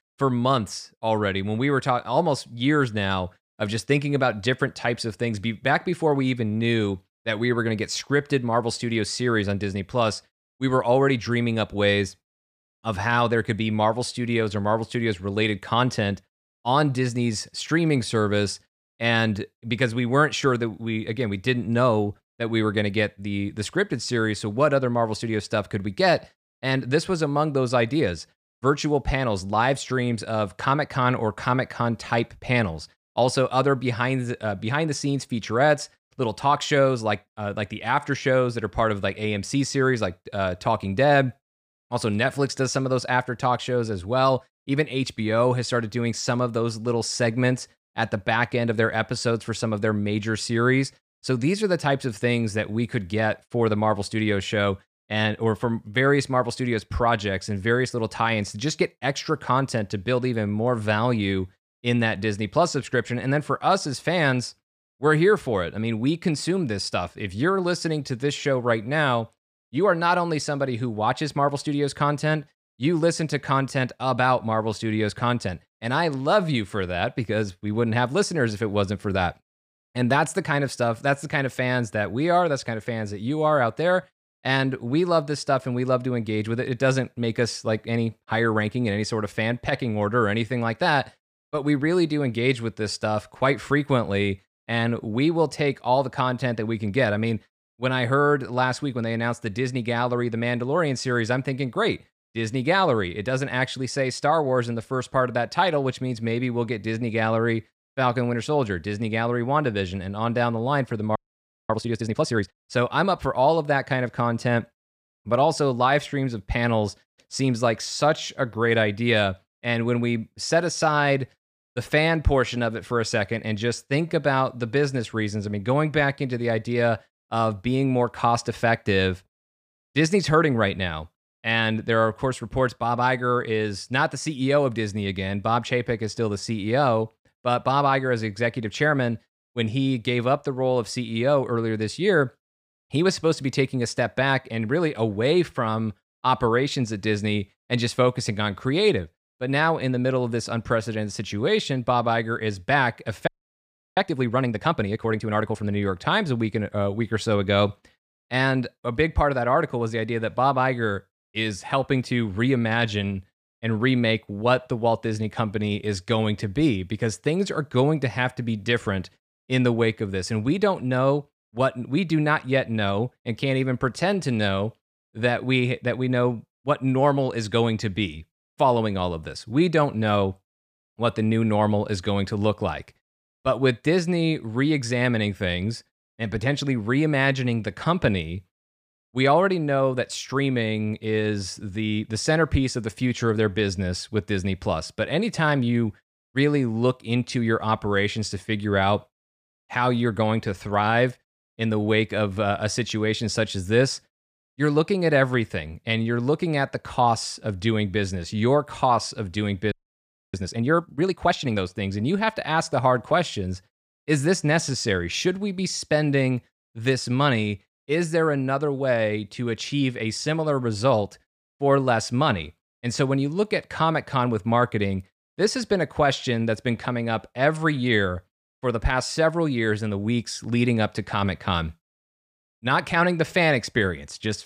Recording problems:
audio freezing; at 1:51 for 0.5 s, at 2:33 for 0.5 s and at 3:30 for 0.5 s

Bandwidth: 14.5 kHz